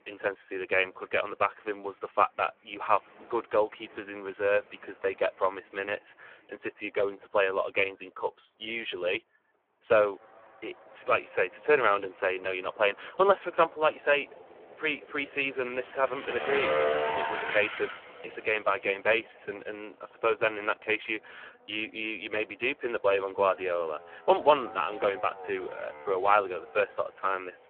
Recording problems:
phone-call audio; poor line
traffic noise; loud; throughout; 7 dB below the speech

